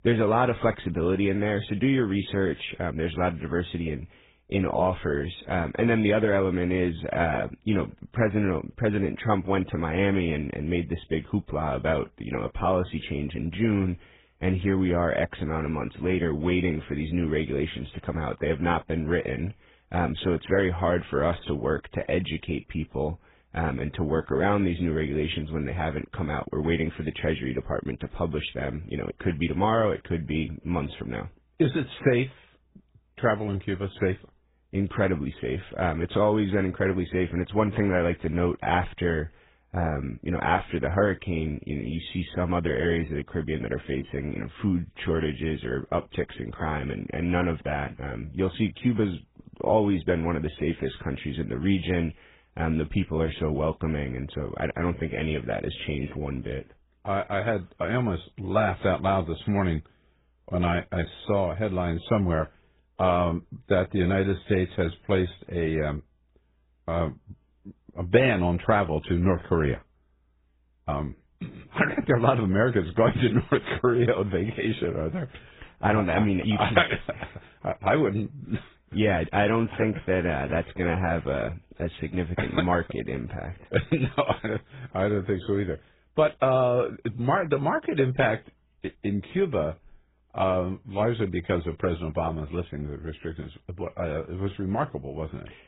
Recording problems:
garbled, watery; badly
high frequencies cut off; severe; nothing above 4 kHz

